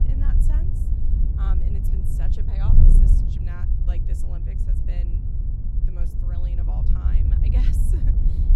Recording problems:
wind noise on the microphone; heavy; 4 dB above the speech

